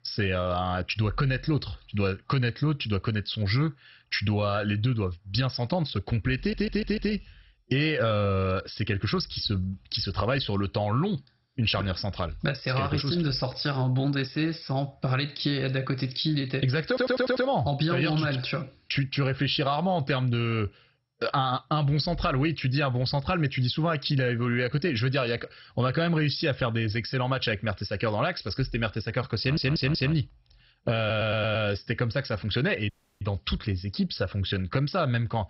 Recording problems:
garbled, watery; badly; nothing above 5.5 kHz
squashed, flat; somewhat
audio stuttering; 4 times, first at 6.5 s
audio cutting out; at 33 s

